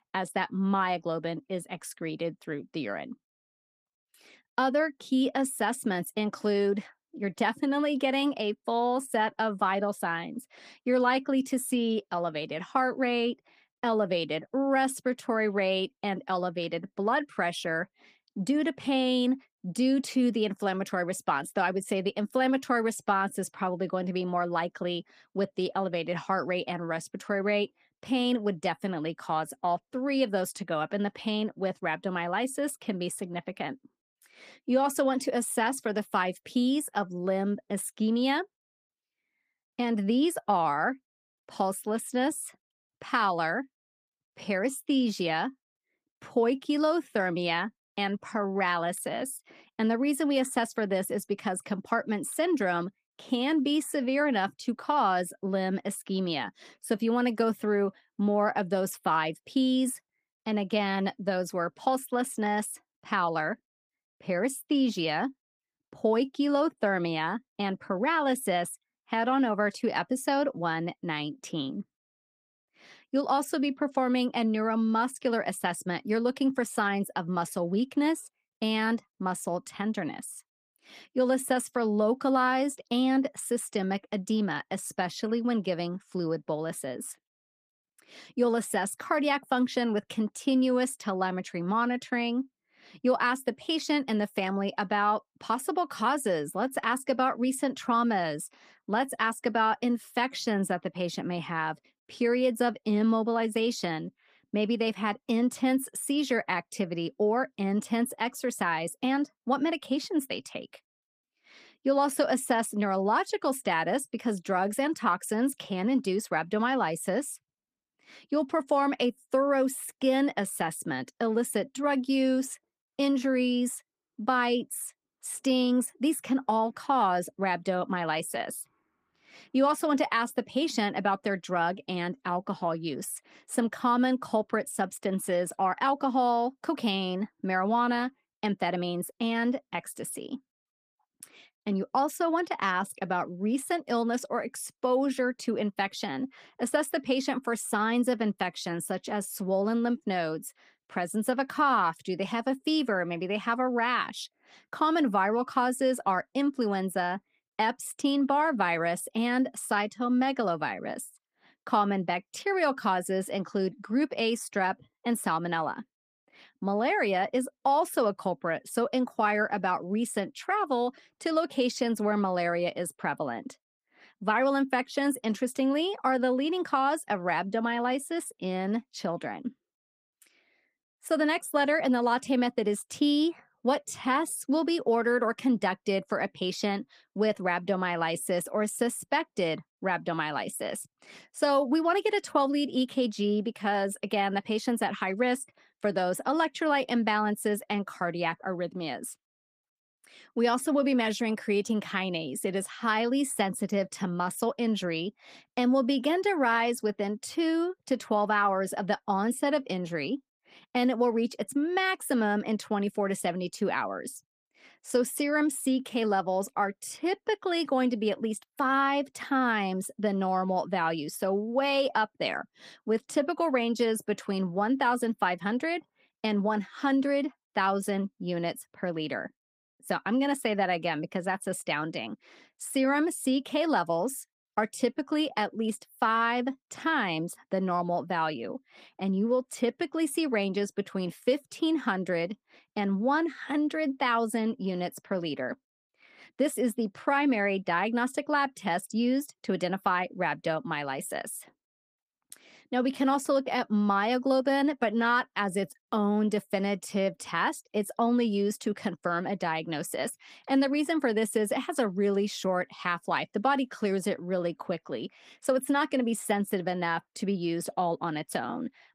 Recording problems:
garbled, watery; slightly; nothing above 15 kHz

